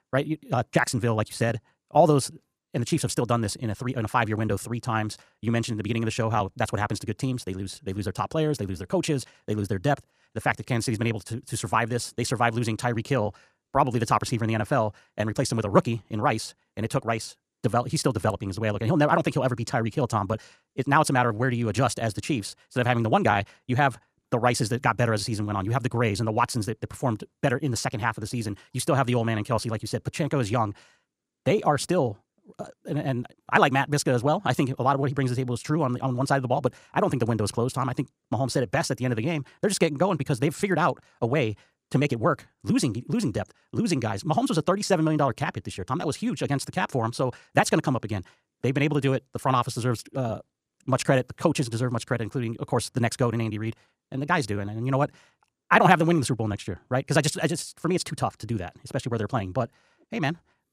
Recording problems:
wrong speed, natural pitch; too fast; 1.5 times normal speed

